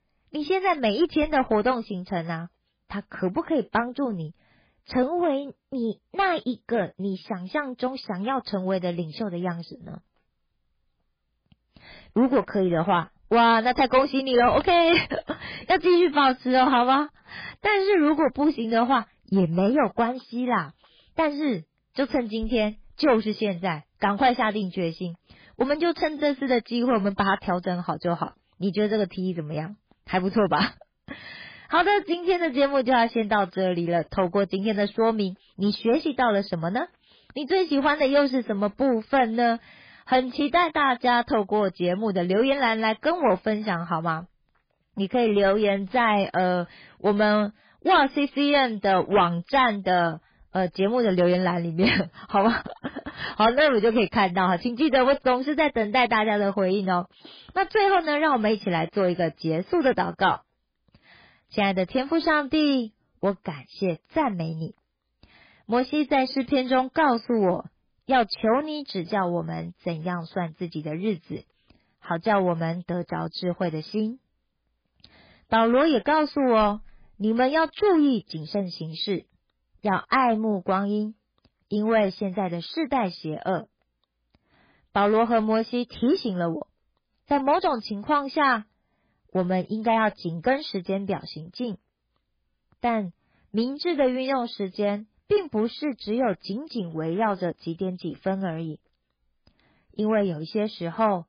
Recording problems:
garbled, watery; badly; nothing above 5 kHz
distortion; slight; 3% of the sound clipped

